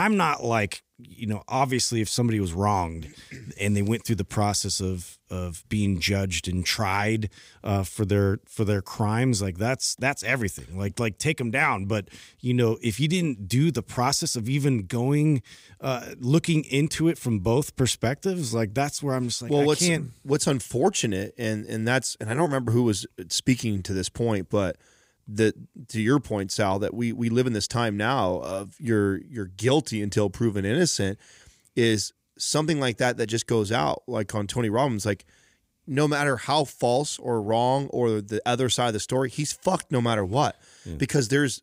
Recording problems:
abrupt cut into speech; at the start

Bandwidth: 15.5 kHz